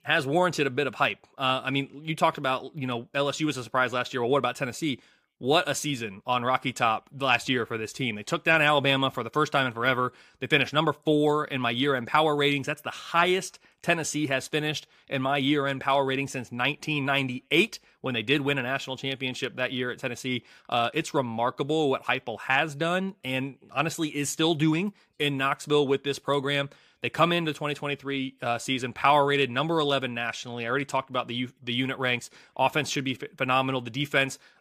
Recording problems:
none

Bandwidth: 15 kHz